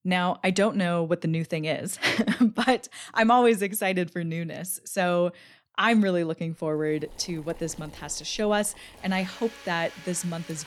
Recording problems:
household noises; faint; from 7 s on; 20 dB below the speech

